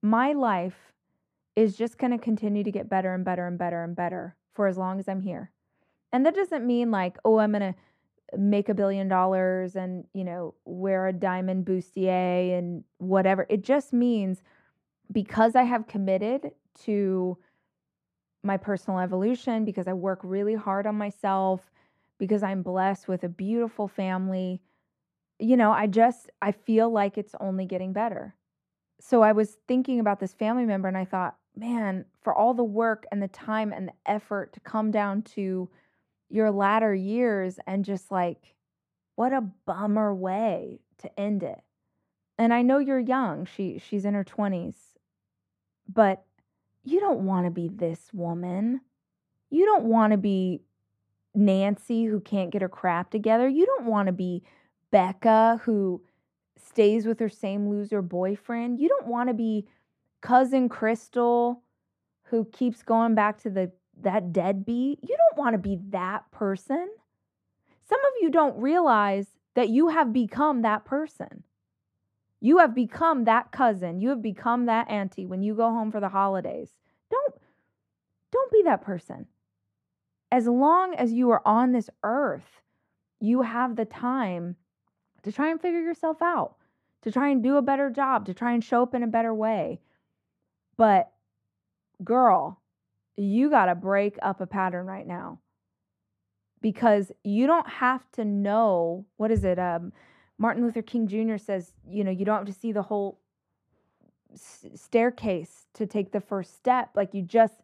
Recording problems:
muffled; very; fading above 3 kHz

